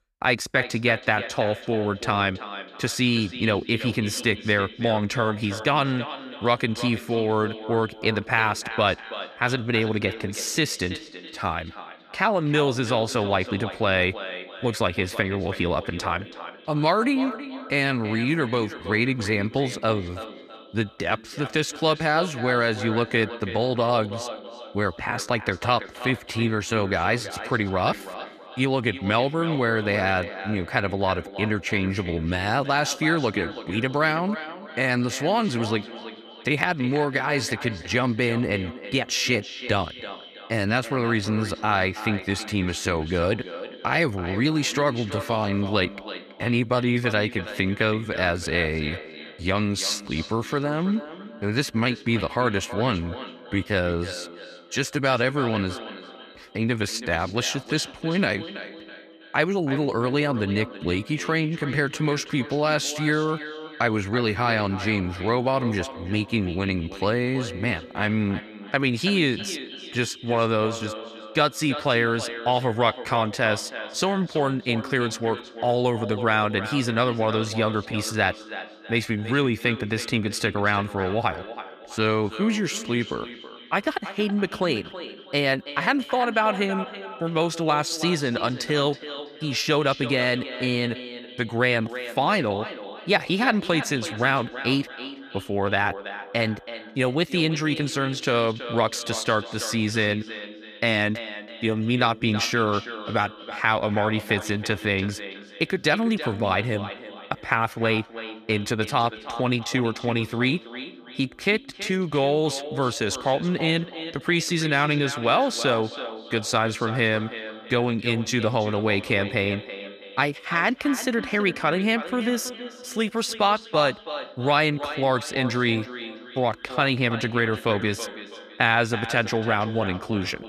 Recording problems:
echo of what is said; noticeable; throughout; 330 ms later, 10 dB below the speech

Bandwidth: 14.5 kHz